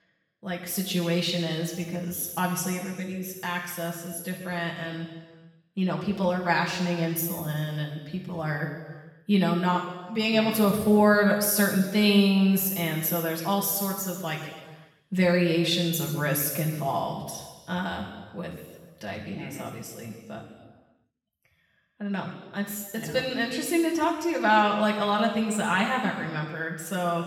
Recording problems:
off-mic speech; far
room echo; noticeable; dies away in 1.3 s

